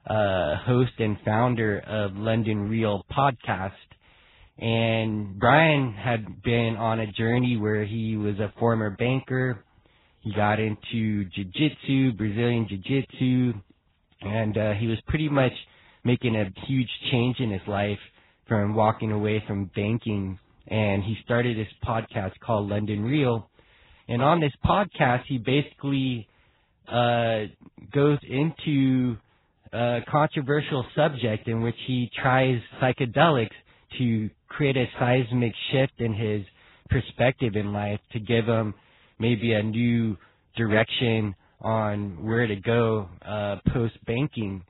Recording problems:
garbled, watery; badly; nothing above 4 kHz

